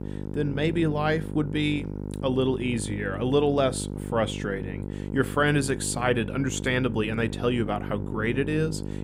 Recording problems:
electrical hum; noticeable; throughout; 50 Hz, 15 dB below the speech

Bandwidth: 15.5 kHz